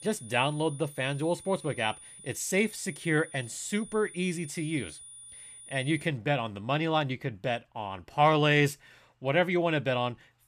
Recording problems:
high-pitched whine; noticeable; until 6 s; 9.5 kHz, 15 dB below the speech

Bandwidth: 14.5 kHz